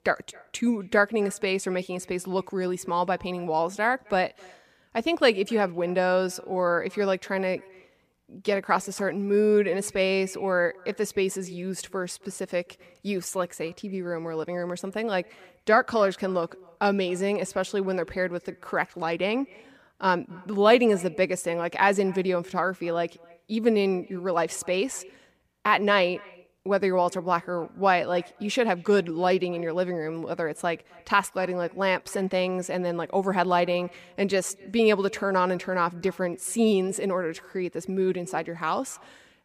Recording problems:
echo of what is said; faint; throughout; 260 ms later, 25 dB below the speech

